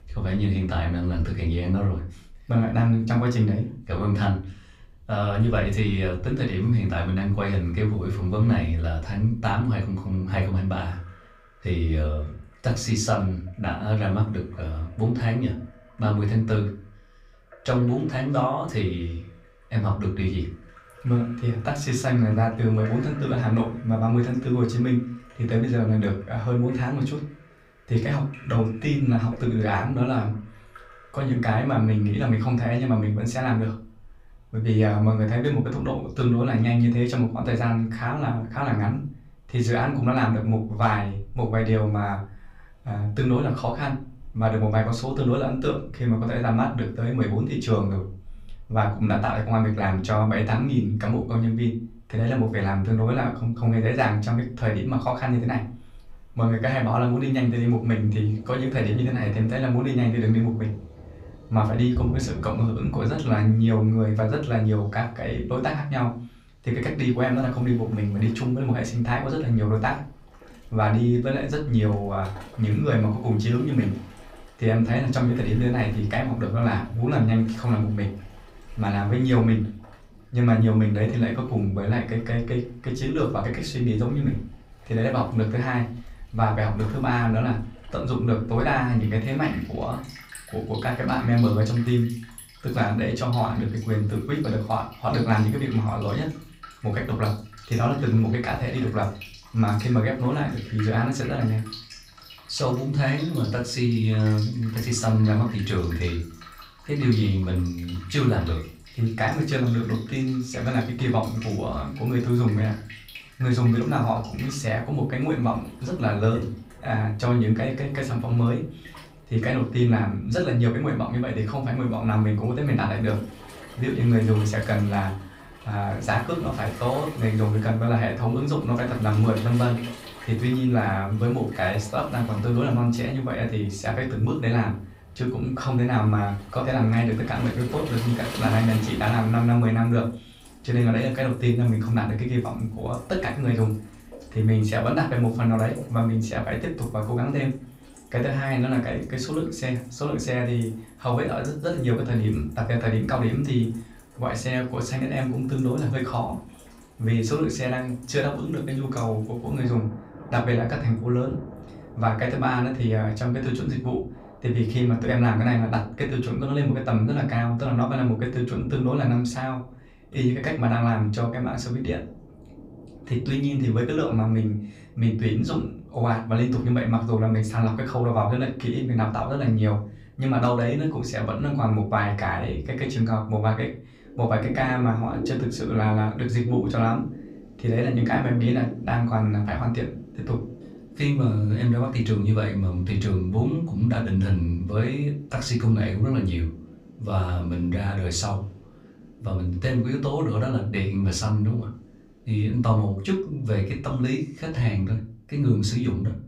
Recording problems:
off-mic speech; far
room echo; very slight; dies away in 0.3 s
rain or running water; noticeable; throughout; 20 dB below the speech

